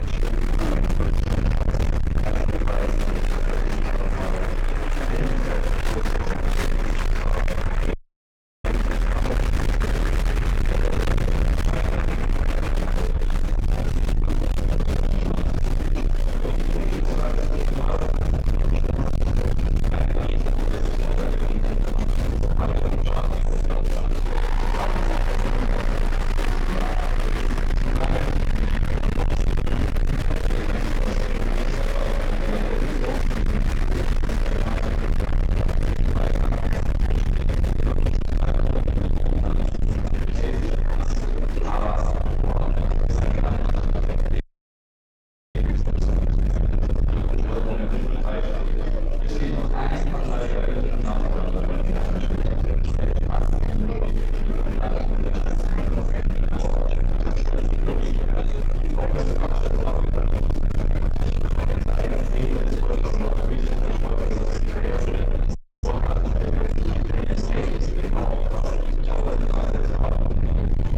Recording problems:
distortion; heavy; 7 dB below the speech
room echo; strong; dies away in 1.2 s
off-mic speech; far
murmuring crowd; loud; throughout; as loud as the speech
low rumble; loud; throughout; 4 dB below the speech
audio freezing; at 8 s for 0.5 s, at 44 s for 1 s and at 1:06

